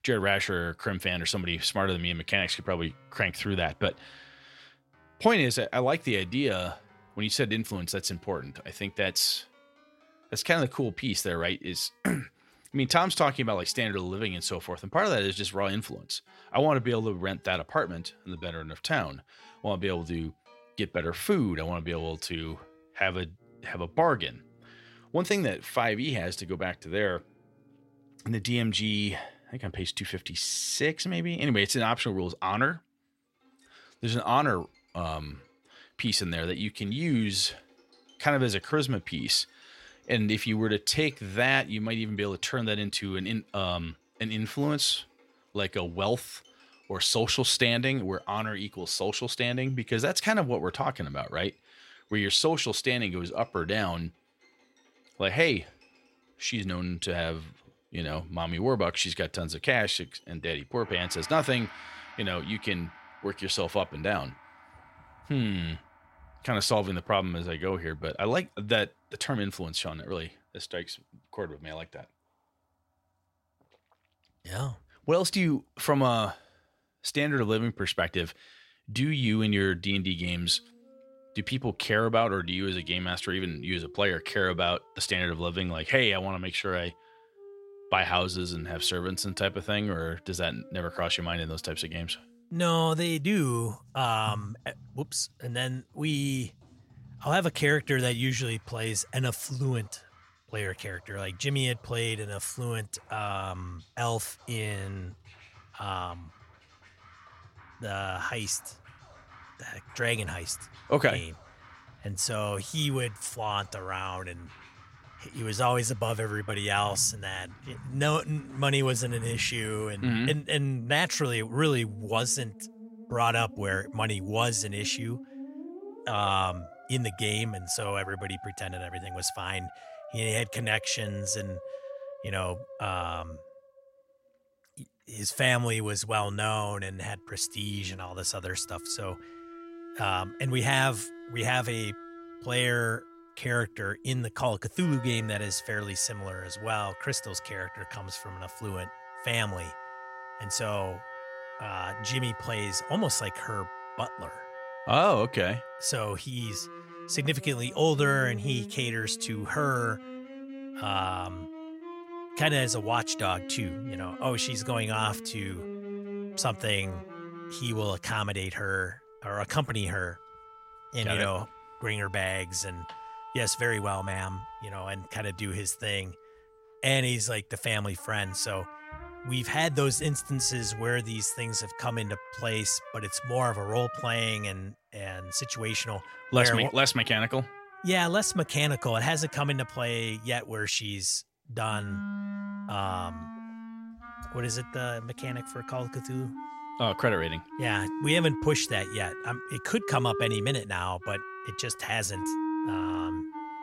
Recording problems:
background music; noticeable; throughout; 15 dB below the speech

